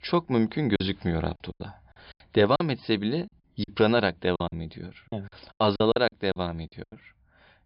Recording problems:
high frequencies cut off; noticeable; nothing above 5.5 kHz
choppy; very; 12% of the speech affected

